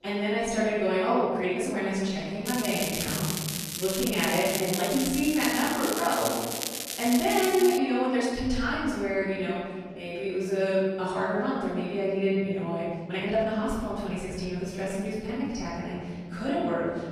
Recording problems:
room echo; strong; dies away in 1.7 s
off-mic speech; far
crackling; loud; from 2.5 to 8 s; 4 dB below the speech
chatter from many people; faint; throughout; 30 dB below the speech
uneven, jittery; strongly; from 1.5 to 16 s

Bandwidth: 14 kHz